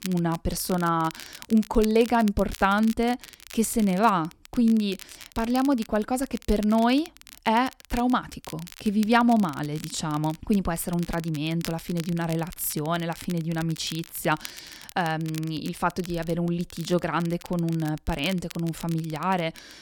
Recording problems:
crackle, like an old record; noticeable; 20 dB below the speech

